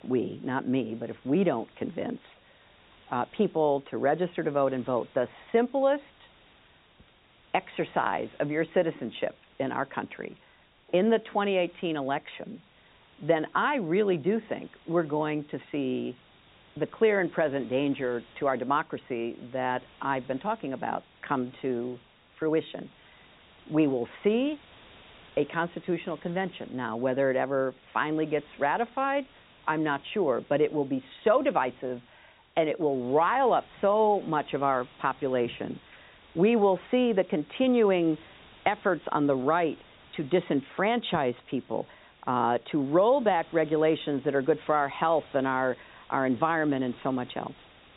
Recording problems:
high frequencies cut off; severe; nothing above 4 kHz
hiss; faint; throughout; 25 dB below the speech

